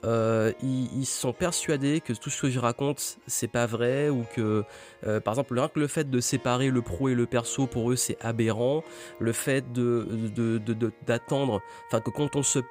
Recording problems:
background music; faint; throughout; 20 dB below the speech

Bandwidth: 15.5 kHz